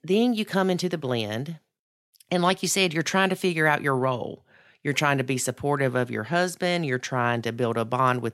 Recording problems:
none

